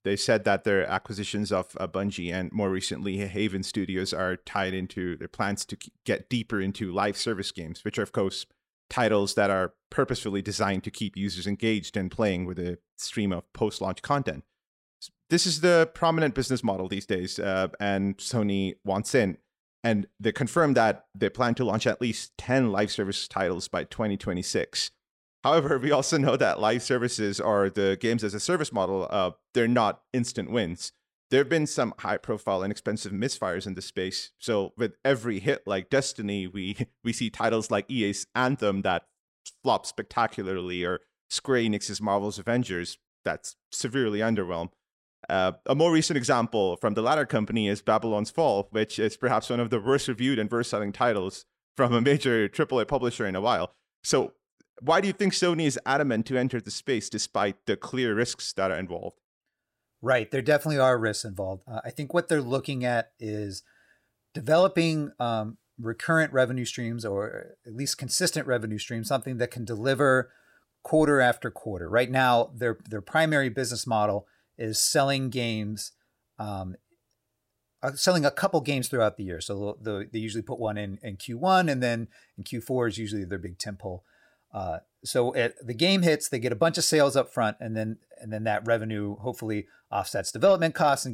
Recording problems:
abrupt cut into speech; at the end

